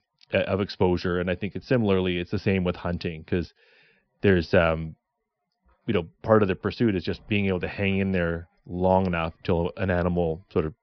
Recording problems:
high frequencies cut off; noticeable; nothing above 5.5 kHz

